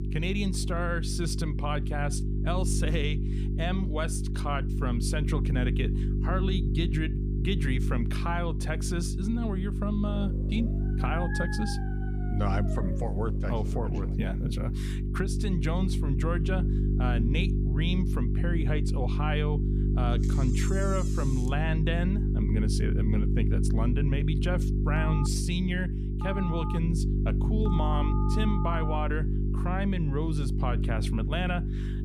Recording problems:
electrical hum; loud; throughout; 50 Hz, 5 dB below the speech
dog barking; noticeable; from 10 to 13 s; peak 3 dB below the speech
door banging; noticeable; from 20 to 22 s; peak 9 dB below the speech
phone ringing; noticeable; from 25 to 29 s; peak 7 dB below the speech

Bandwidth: 15 kHz